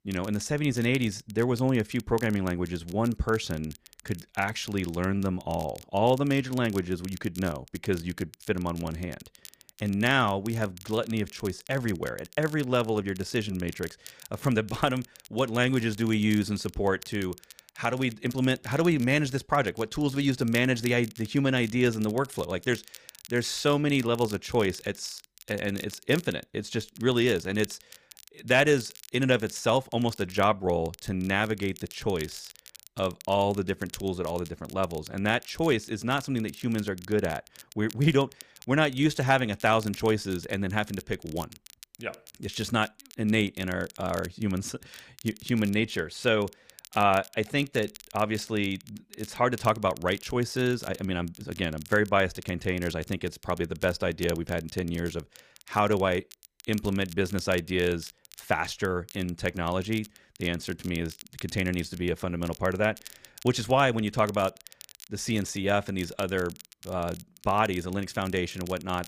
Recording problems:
crackle, like an old record; noticeable; 20 dB below the speech

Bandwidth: 15 kHz